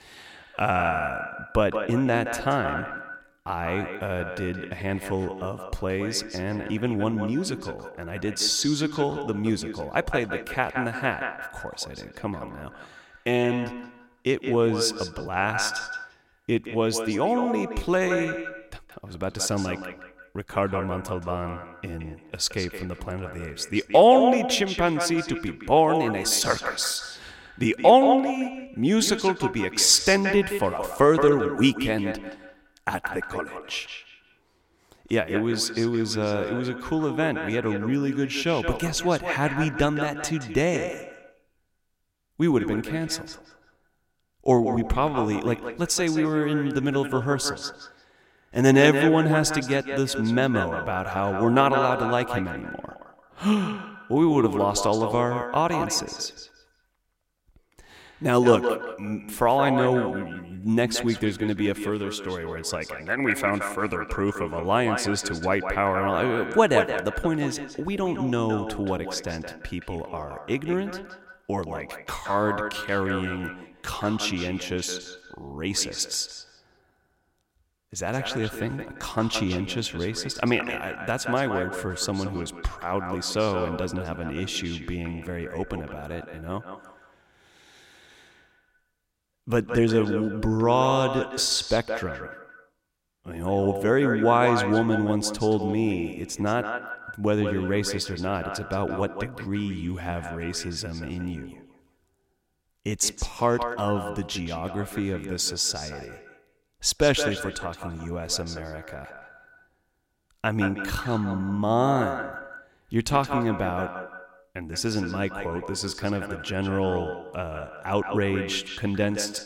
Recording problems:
echo of what is said; strong; throughout; 170 ms later, 7 dB below the speech

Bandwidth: 16 kHz